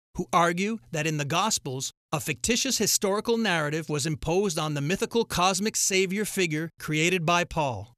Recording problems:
none

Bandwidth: 13.5 kHz